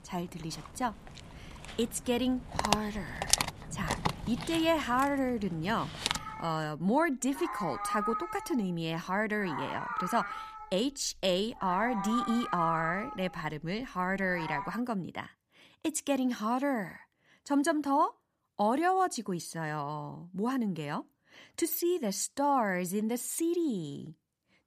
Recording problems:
animal sounds; loud; until 15 s; 4 dB below the speech

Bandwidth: 14.5 kHz